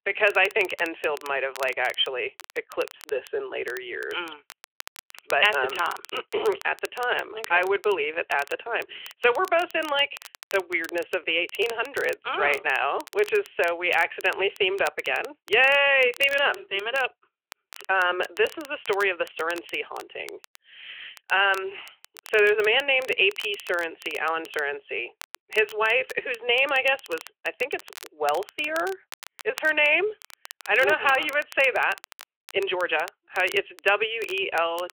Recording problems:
thin; very; fading below 400 Hz
phone-call audio
crackle, like an old record; faint; 20 dB below the speech

